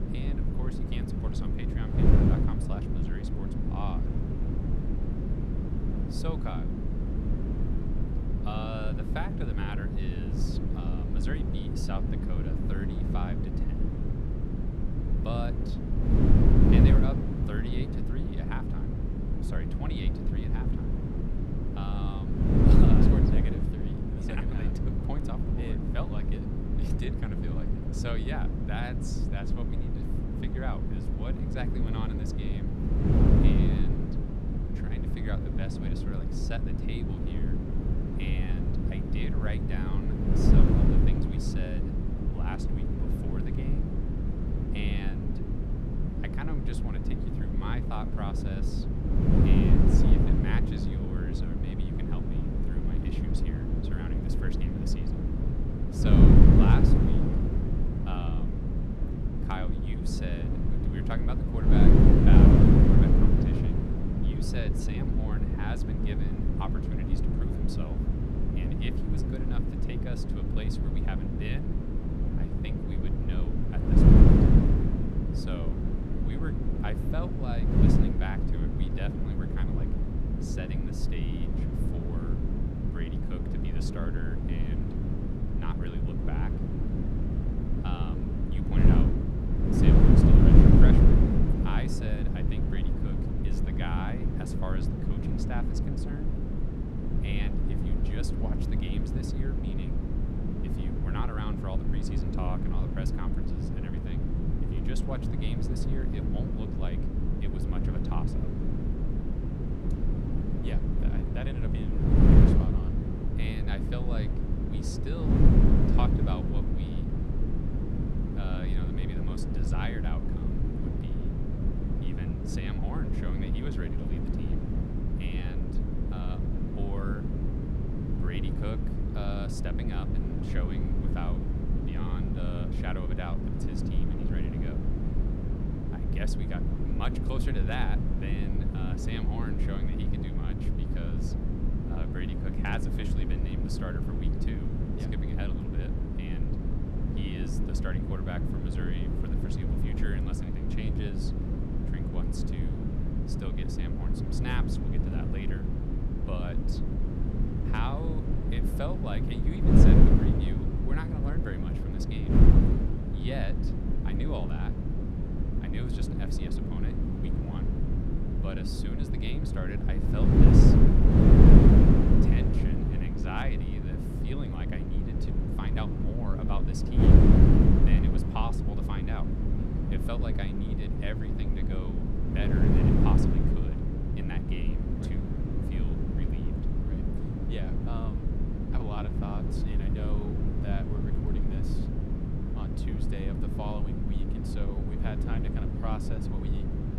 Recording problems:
wind noise on the microphone; heavy; 5 dB above the speech

